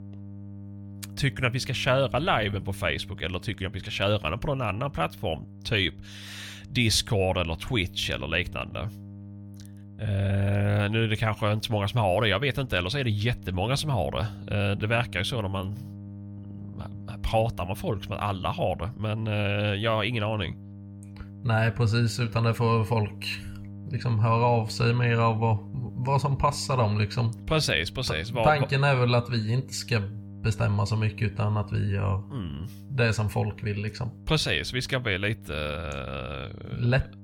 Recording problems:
electrical hum; faint; throughout; 50 Hz, 25 dB below the speech

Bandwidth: 17.5 kHz